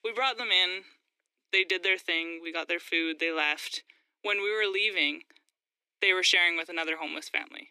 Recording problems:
thin; very; fading below 300 Hz

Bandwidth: 14.5 kHz